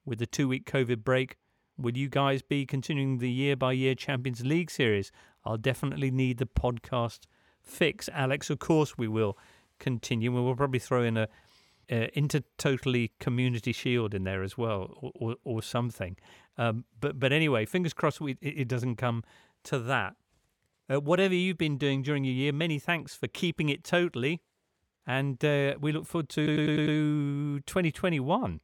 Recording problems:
audio stuttering; at 26 s

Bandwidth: 17.5 kHz